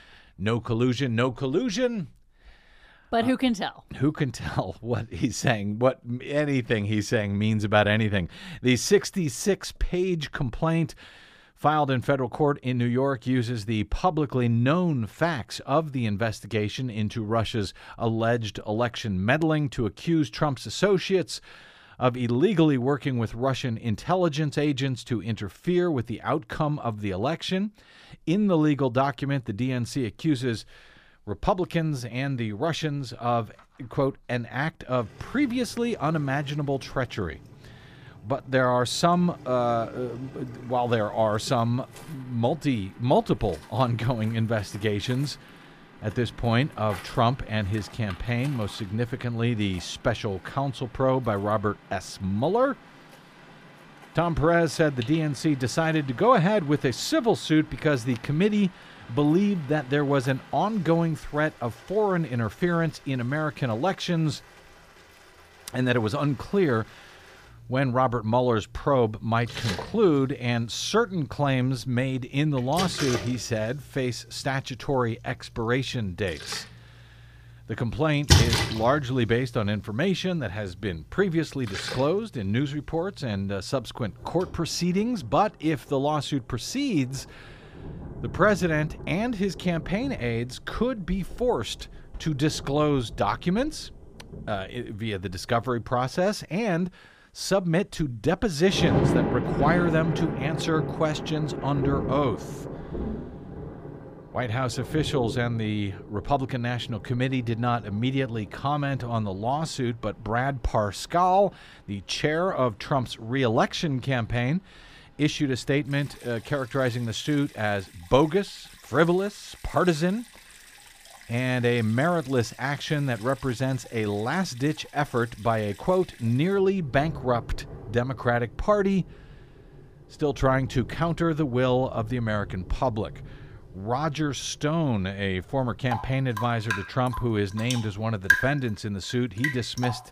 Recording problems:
rain or running water; loud; from 35 s on; 8 dB below the speech

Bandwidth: 15 kHz